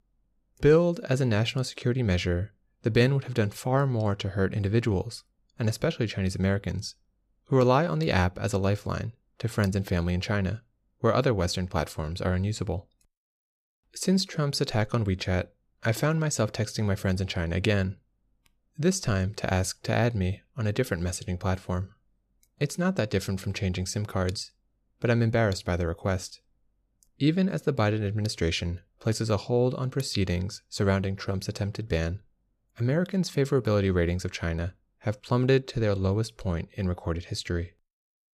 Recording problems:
none

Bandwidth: 14.5 kHz